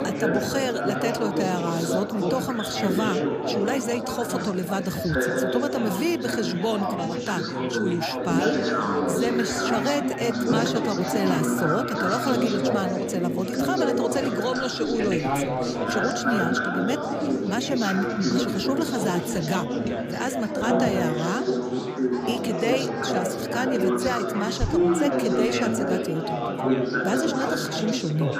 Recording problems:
chatter from many people; very loud; throughout; 2 dB above the speech

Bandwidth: 15 kHz